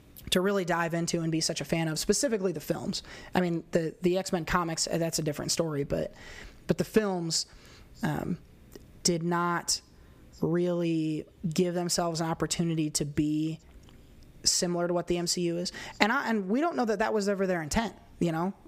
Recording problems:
squashed, flat; somewhat

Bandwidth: 15 kHz